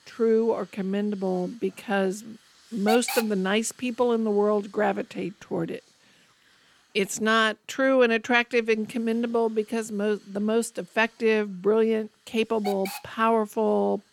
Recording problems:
hiss; loud; throughout; 8 dB below the speech

